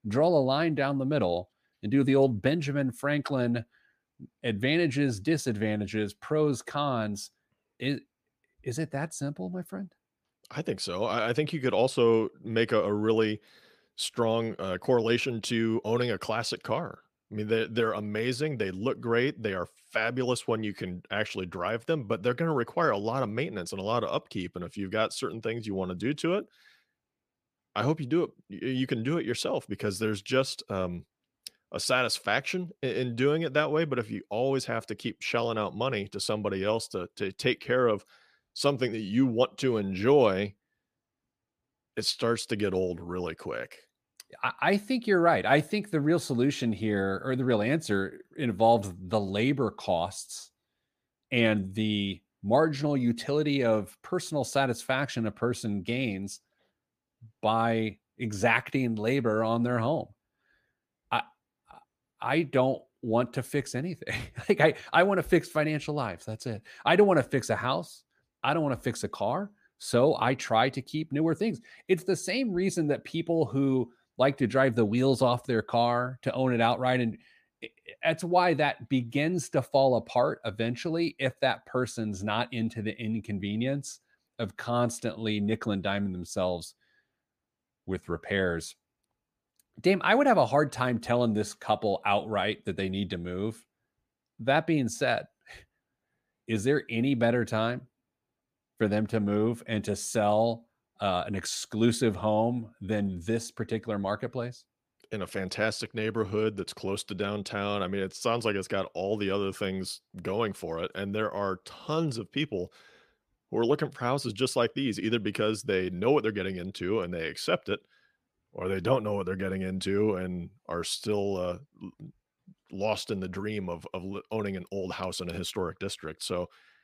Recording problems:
none

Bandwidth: 15 kHz